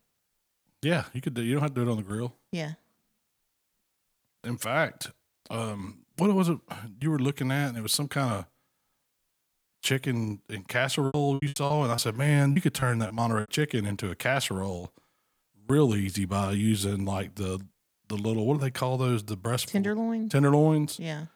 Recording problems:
choppy; very; from 11 to 13 s; 17% of the speech affected

